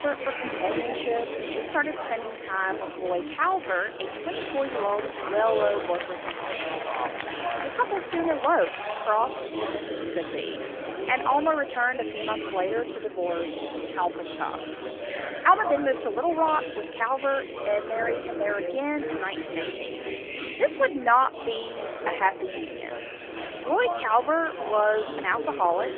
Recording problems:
phone-call audio; nothing above 3.5 kHz
chatter from many people; loud; throughout; 6 dB below the speech

